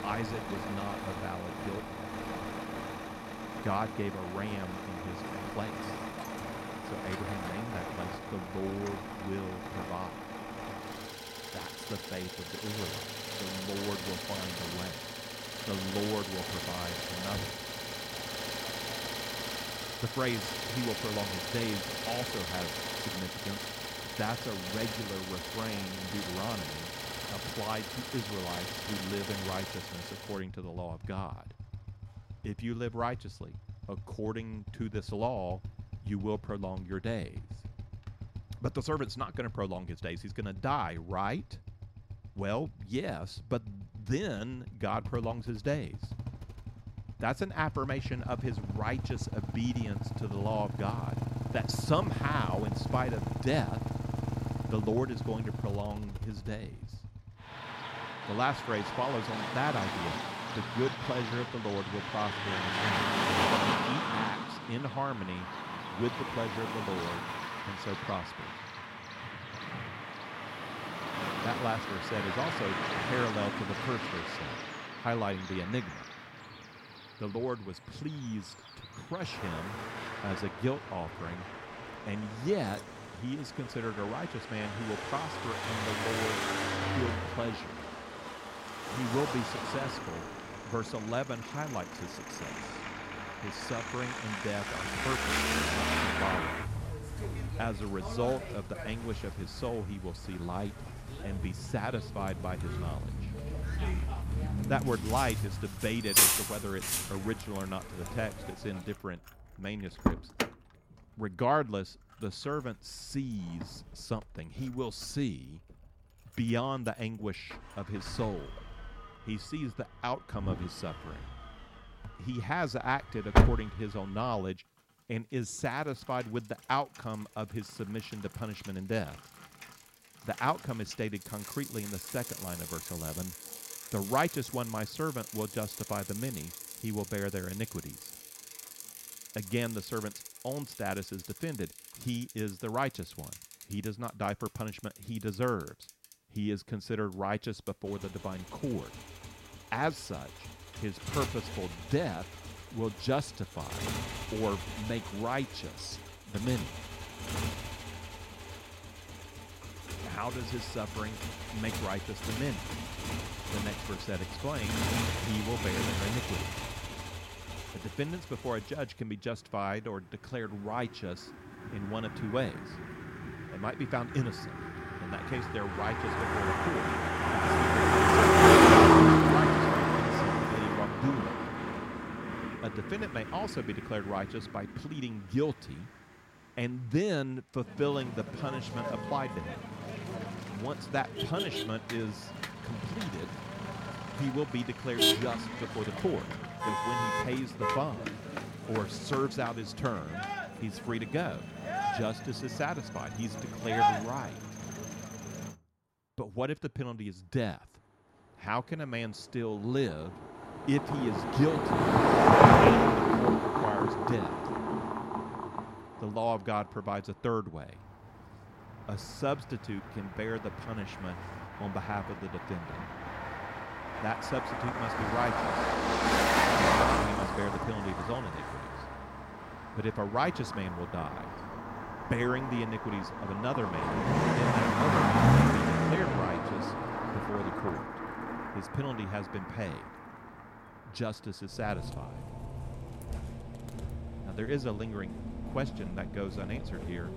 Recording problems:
traffic noise; very loud; throughout; 4 dB above the speech

